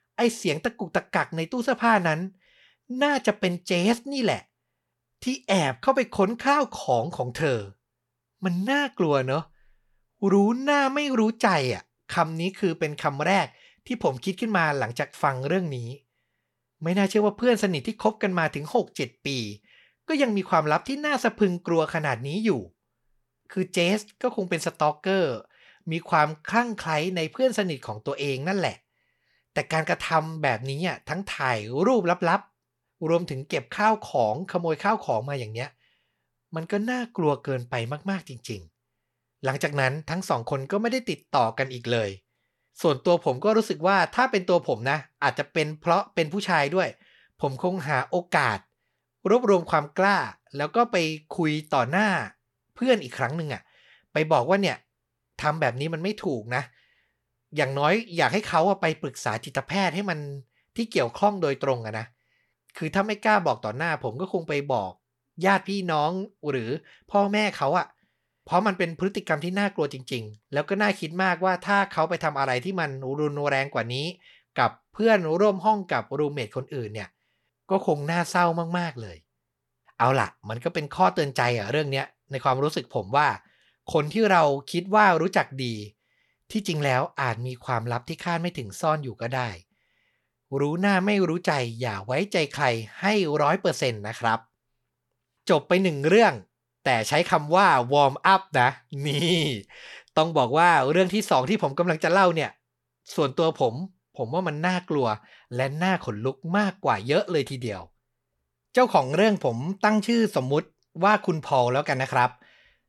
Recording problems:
none

